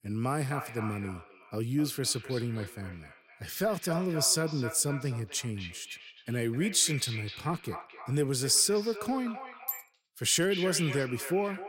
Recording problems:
echo of what is said; noticeable; throughout; 260 ms later, 10 dB below the speech

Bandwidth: 16 kHz